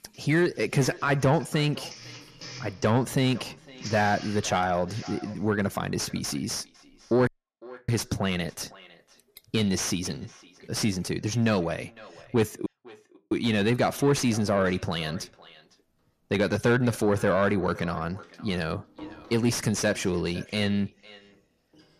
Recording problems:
echo of what is said; faint; throughout; 510 ms later, 20 dB below the speech
distortion; slight; 10 dB below the speech
household noises; noticeable; throughout; 20 dB below the speech
audio cutting out; at 7.5 s for 0.5 s and at 13 s for 0.5 s

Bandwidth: 14.5 kHz